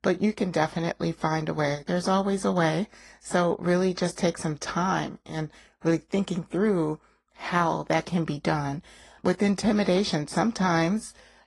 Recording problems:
garbled, watery; slightly; nothing above 10 kHz

